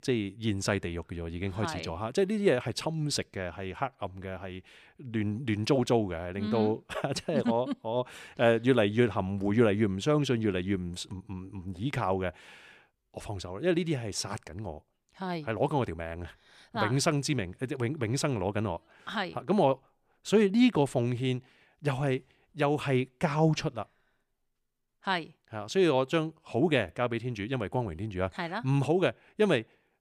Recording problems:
none

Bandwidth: 15 kHz